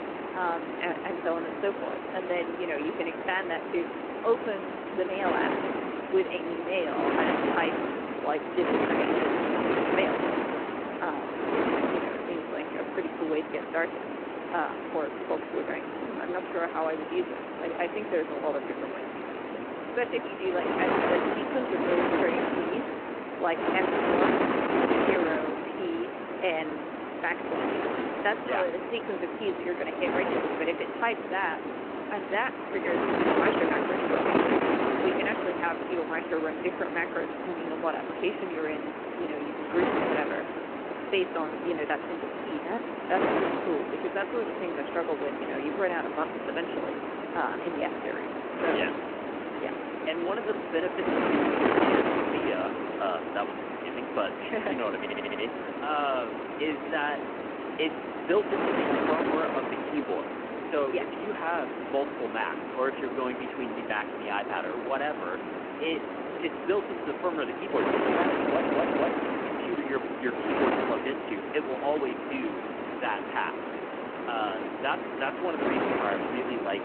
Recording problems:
phone-call audio
wind noise on the microphone; heavy; 1 dB above the speech
audio stuttering; at 55 s and at 1:08

